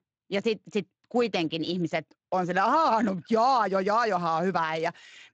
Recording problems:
garbled, watery; slightly; nothing above 7.5 kHz

